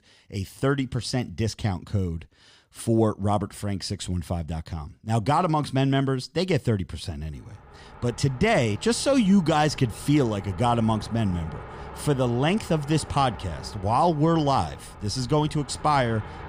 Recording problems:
traffic noise; noticeable; from 7.5 s on; 15 dB below the speech

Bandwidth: 15.5 kHz